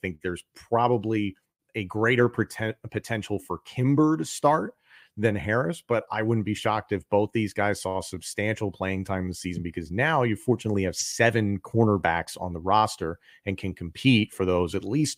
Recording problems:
none

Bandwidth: 15.5 kHz